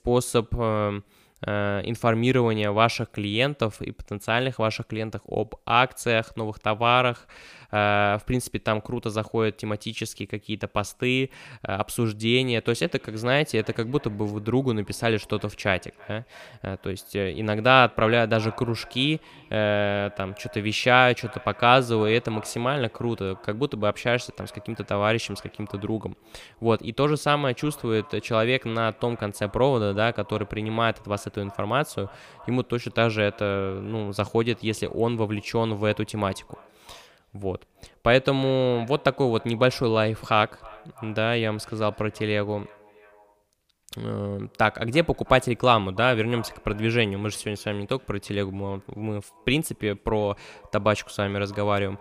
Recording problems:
echo of what is said; faint; from 13 s on; 320 ms later, 25 dB below the speech

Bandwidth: 15 kHz